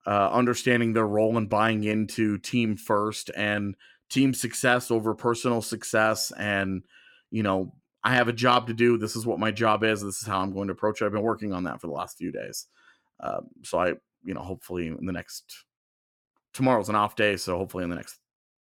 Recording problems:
none

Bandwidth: 17 kHz